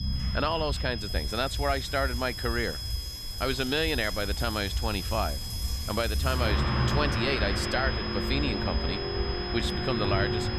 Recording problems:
high-pitched whine; loud; throughout; 5 kHz, 6 dB below the speech
traffic noise; loud; throughout; 4 dB below the speech
murmuring crowd; faint; throughout; 25 dB below the speech
low rumble; faint; throughout; 20 dB below the speech

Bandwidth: 14.5 kHz